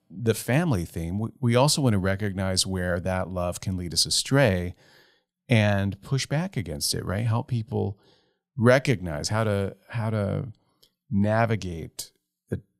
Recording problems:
none

